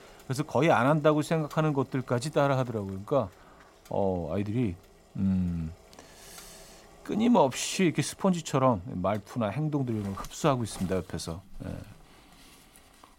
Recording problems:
household noises; faint; throughout; 25 dB below the speech

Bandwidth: 16 kHz